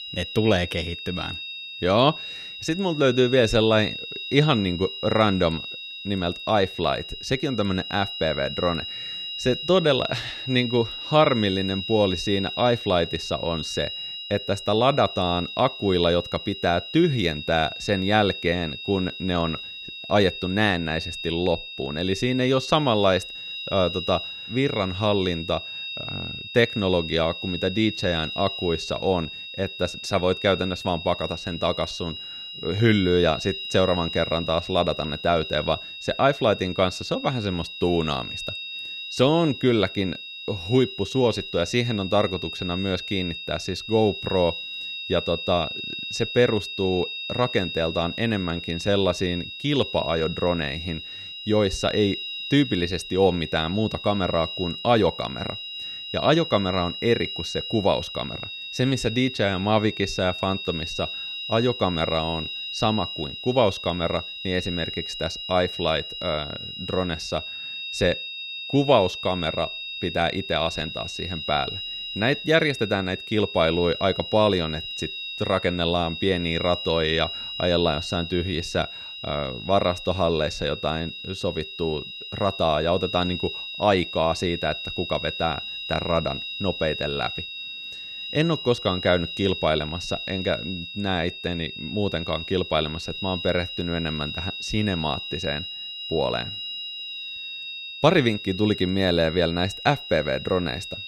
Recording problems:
high-pitched whine; loud; throughout; 3.5 kHz, 8 dB below the speech

